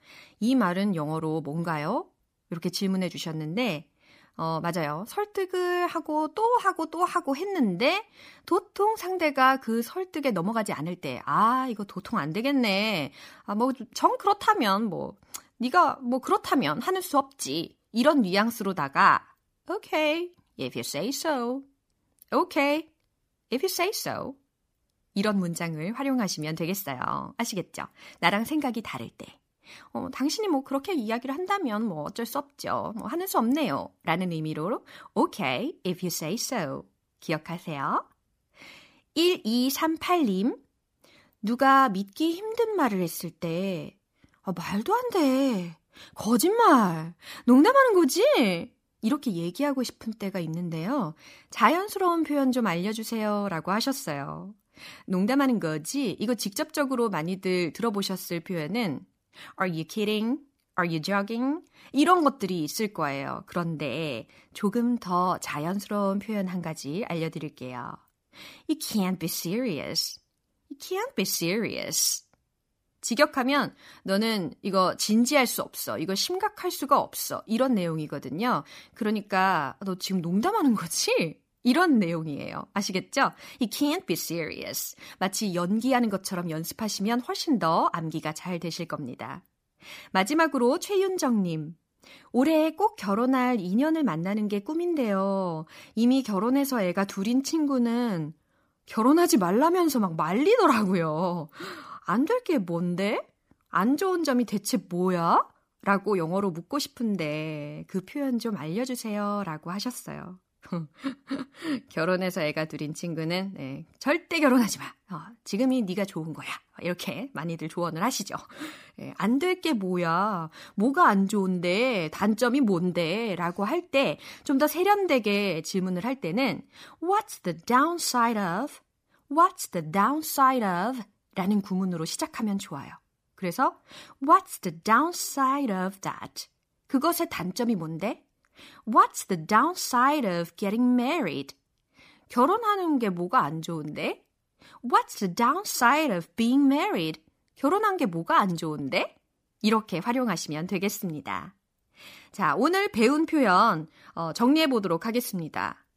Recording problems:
none

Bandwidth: 15 kHz